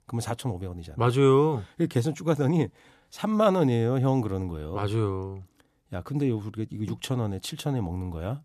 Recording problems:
none

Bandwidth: 14 kHz